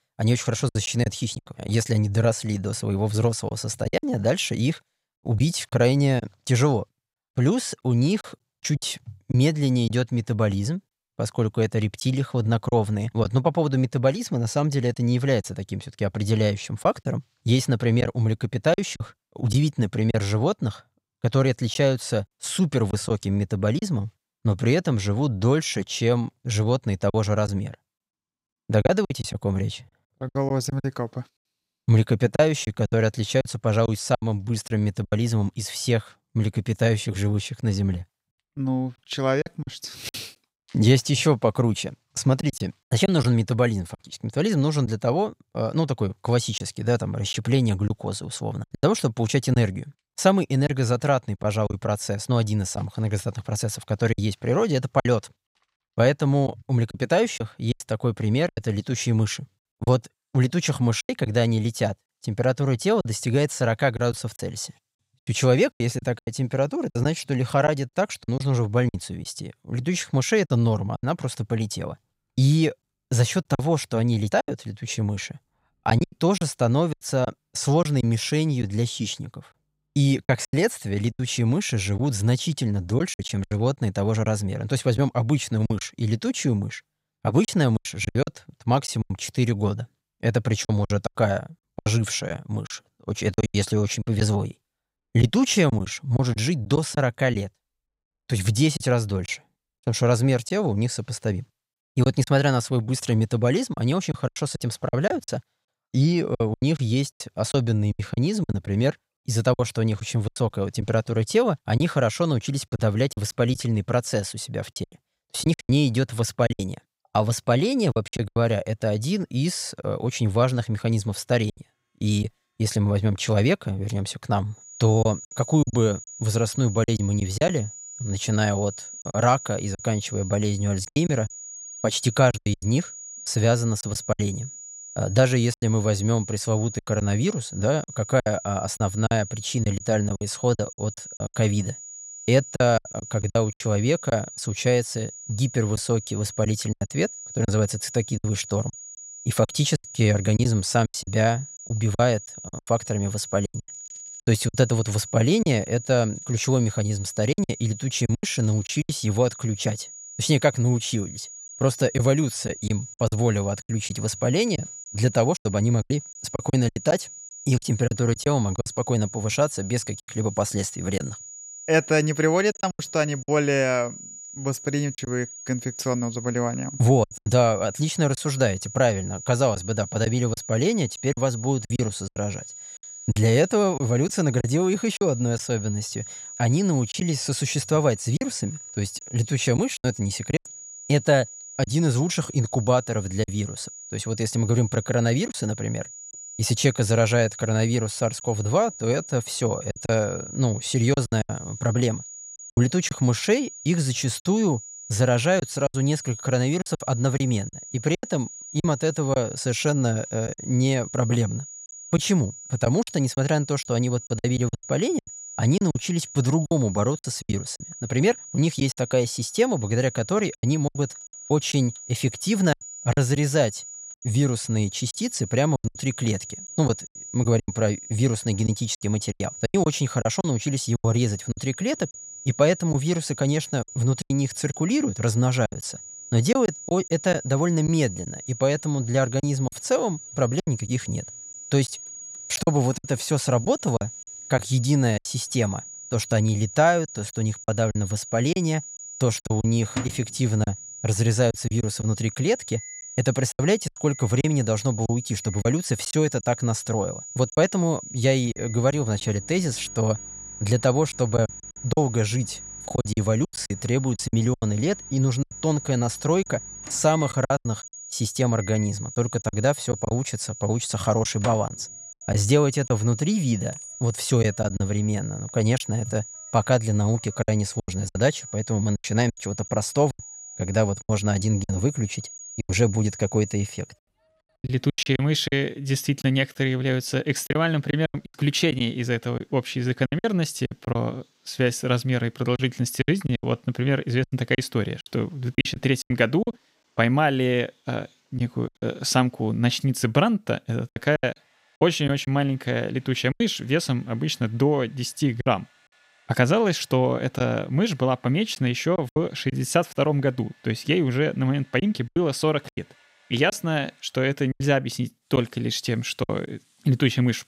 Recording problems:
high-pitched whine; noticeable; from 2:05 to 4:44; 7 kHz, 15 dB below the speech
household noises; faint; throughout; 25 dB below the speech
choppy; very; 7% of the speech affected

